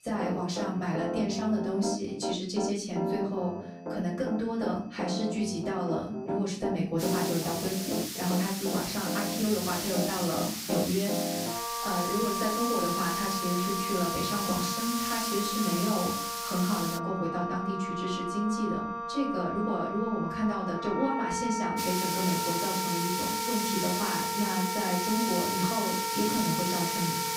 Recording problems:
off-mic speech; far
room echo; slight; dies away in 0.5 s
background music; loud; throughout; 3 dB below the speech
hiss; loud; from 7 to 17 s and from 22 s on; 2 dB below the speech
high-pitched whine; faint; throughout; 2.5 kHz, 30 dB below the speech

